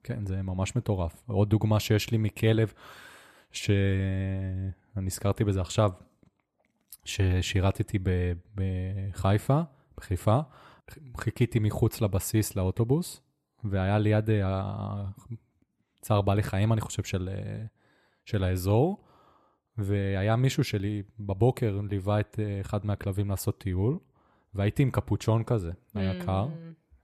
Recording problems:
none

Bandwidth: 13.5 kHz